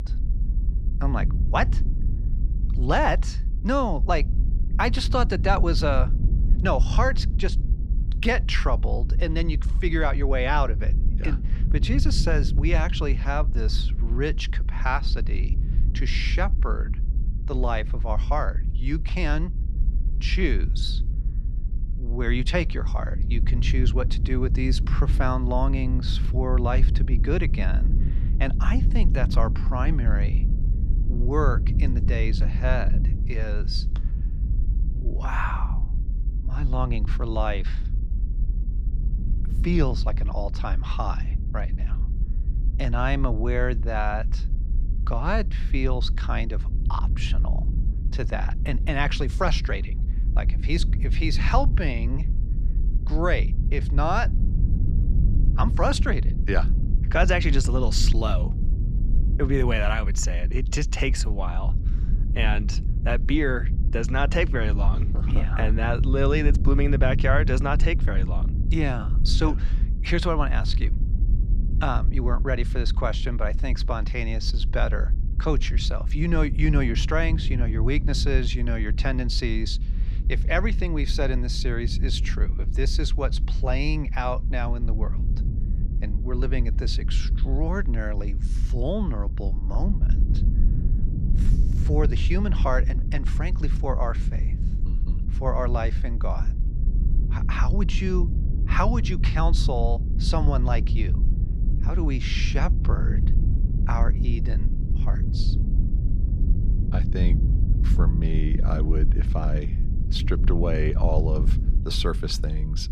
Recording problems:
low rumble; noticeable; throughout; 15 dB below the speech

